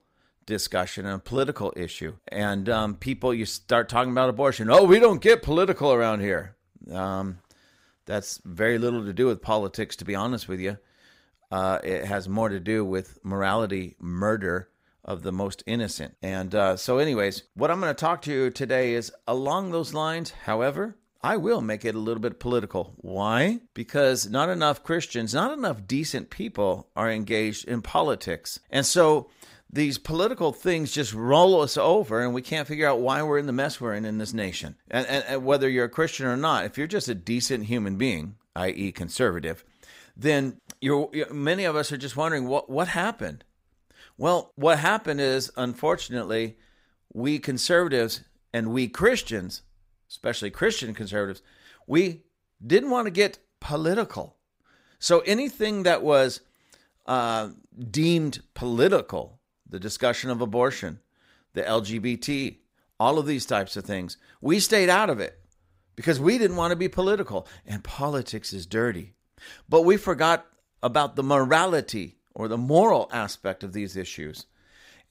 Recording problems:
none

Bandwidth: 15.5 kHz